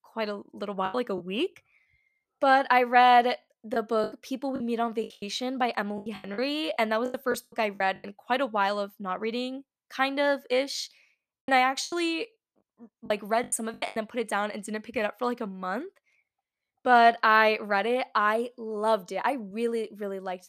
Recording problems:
choppy; very; at 1 s, from 3.5 to 8 s and from 11 to 14 s; 17% of the speech affected

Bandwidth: 14.5 kHz